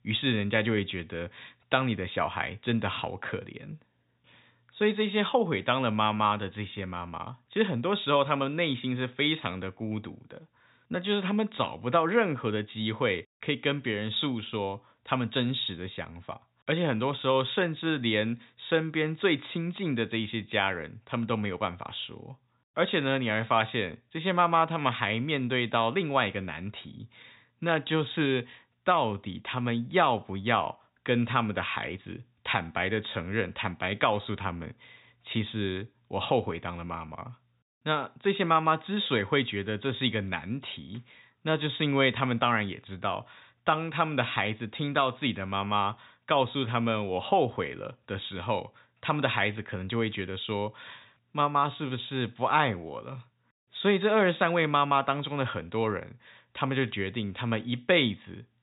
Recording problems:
high frequencies cut off; severe; nothing above 4 kHz

